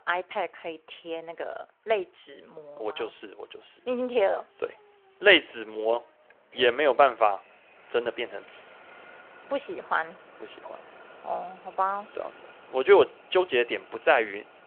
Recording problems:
phone-call audio; nothing above 3 kHz
traffic noise; faint; throughout; 25 dB below the speech

